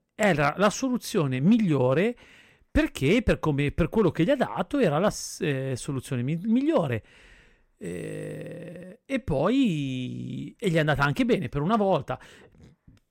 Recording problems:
none

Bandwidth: 16 kHz